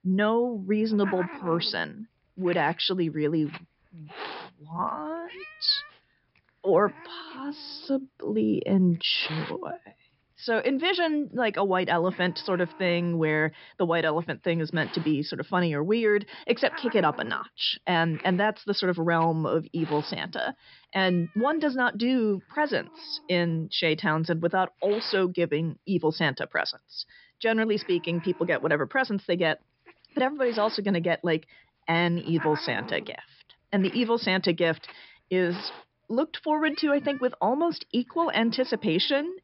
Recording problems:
high frequencies cut off; noticeable; nothing above 5 kHz
hiss; noticeable; throughout; 15 dB below the speech

